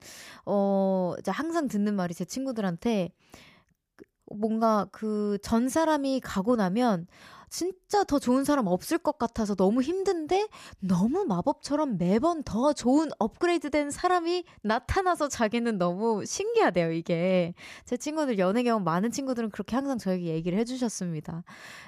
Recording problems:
none

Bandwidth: 14.5 kHz